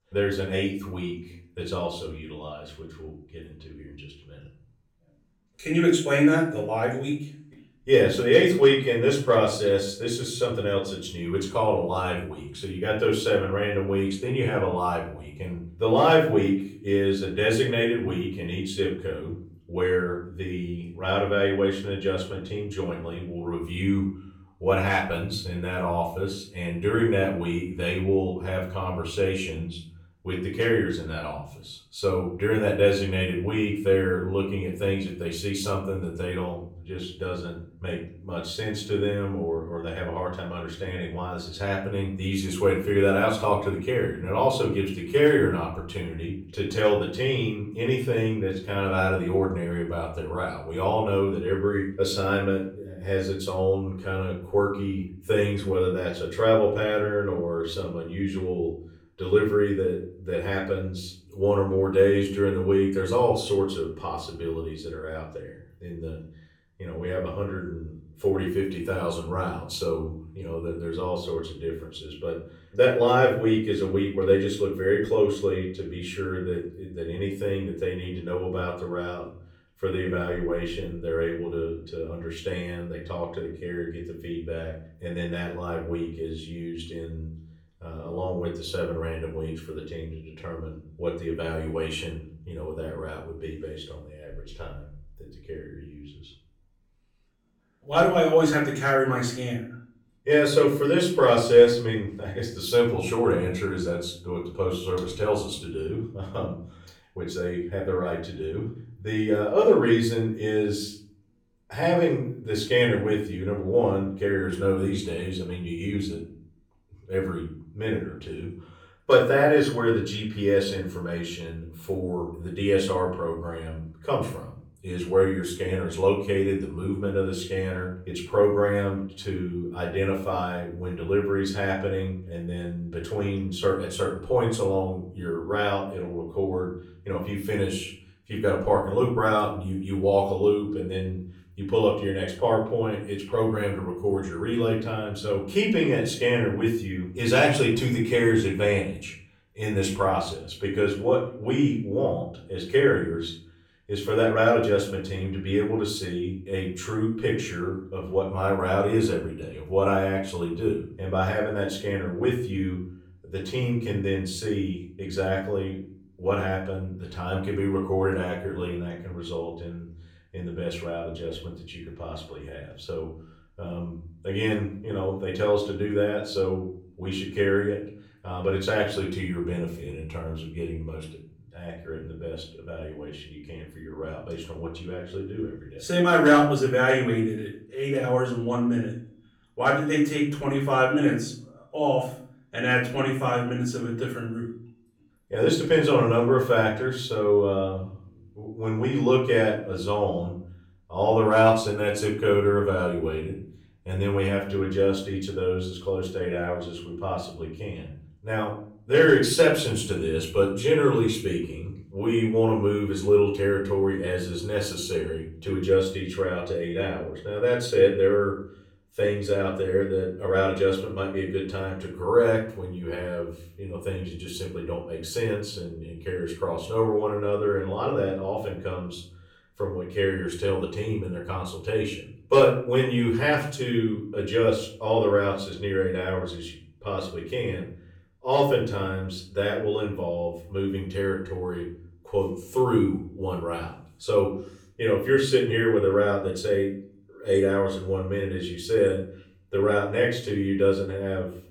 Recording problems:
off-mic speech; far
room echo; slight; dies away in 0.4 s

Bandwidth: 18 kHz